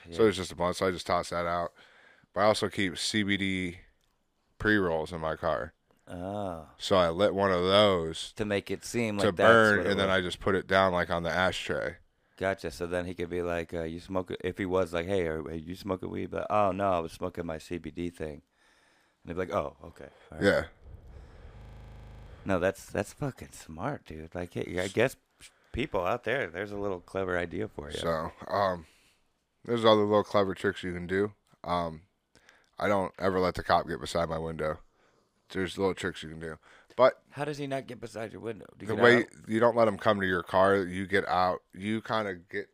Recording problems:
audio freezing; at 22 s for 0.5 s

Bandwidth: 15.5 kHz